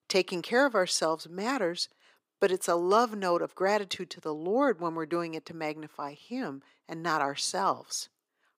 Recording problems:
thin; somewhat; fading below 400 Hz

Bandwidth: 15.5 kHz